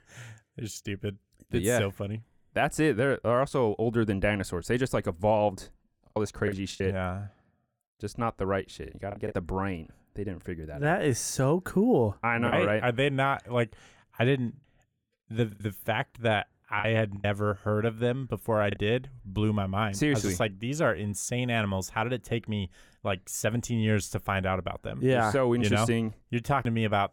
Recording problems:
choppy; very; from 6 to 9.5 s, from 12 to 16 s and from 17 to 19 s; 7% of the speech affected

